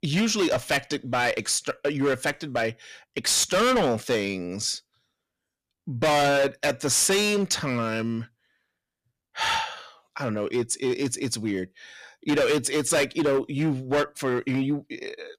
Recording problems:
distortion; heavy; 11% of the sound clipped

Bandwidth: 14.5 kHz